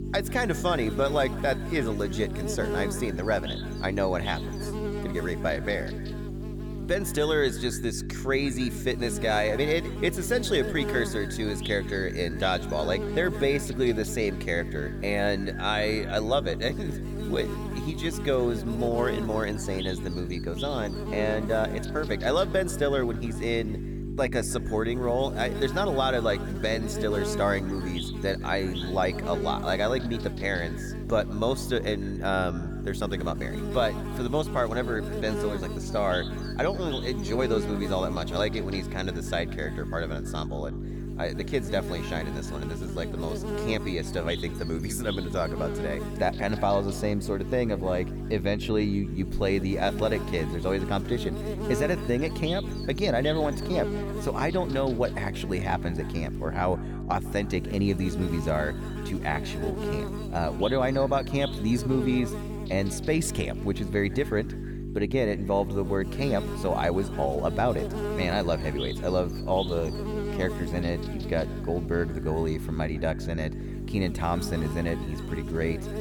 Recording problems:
echo of what is said; faint; throughout; 150 ms later, 20 dB below the speech
electrical hum; loud; throughout; 50 Hz, 9 dB below the speech

